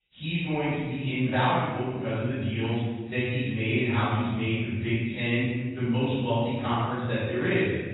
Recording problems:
room echo; strong; dies away in 1.5 s
off-mic speech; far
garbled, watery; badly; nothing above 4 kHz

